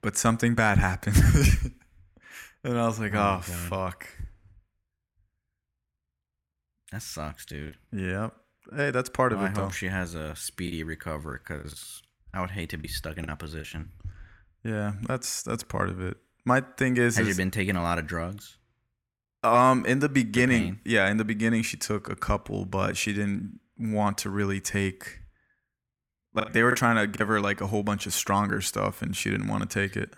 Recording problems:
choppy; very; at 7.5 s, from 11 to 14 s and at 26 s; 8% of the speech affected

